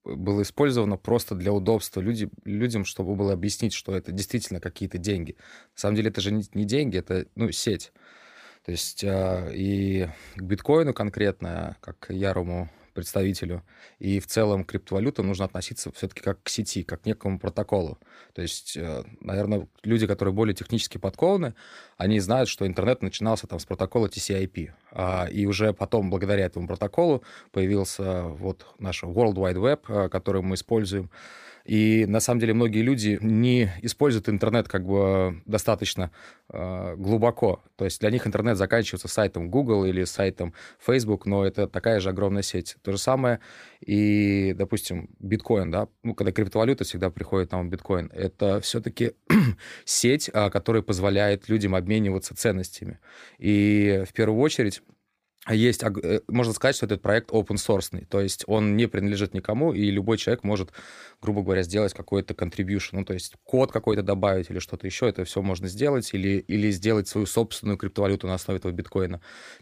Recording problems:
none

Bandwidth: 15 kHz